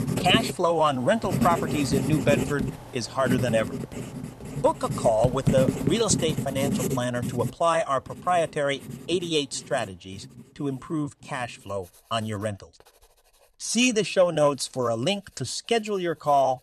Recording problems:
household noises; loud; throughout; 4 dB below the speech

